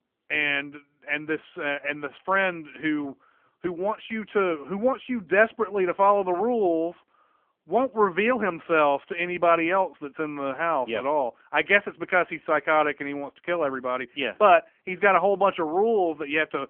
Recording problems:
phone-call audio; poor line

